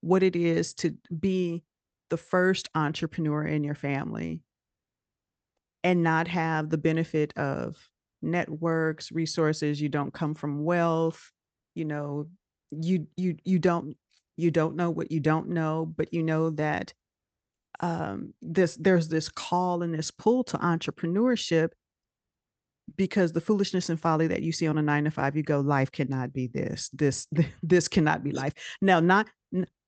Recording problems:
high frequencies cut off; noticeable; nothing above 8 kHz

